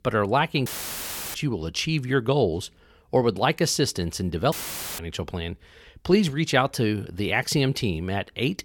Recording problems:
audio cutting out; filled with static; at 0.5 s for 0.5 s and at 4.5 s

